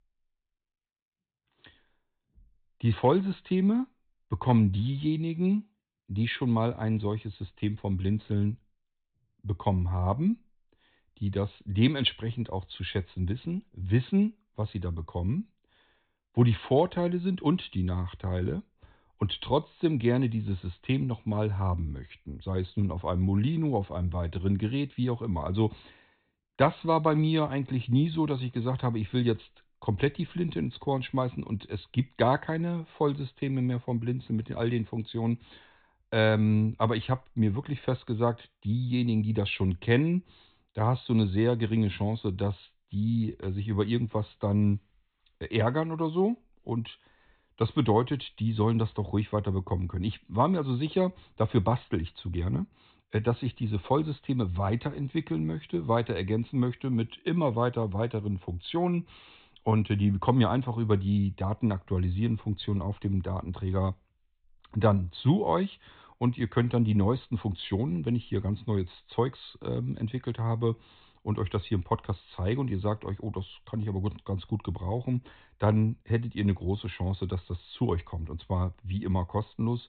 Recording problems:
high frequencies cut off; severe; nothing above 4 kHz

